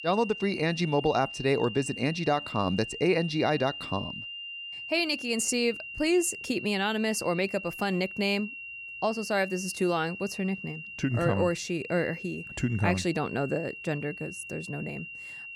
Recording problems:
high-pitched whine; loud; throughout; 3 kHz, 9 dB below the speech

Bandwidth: 16.5 kHz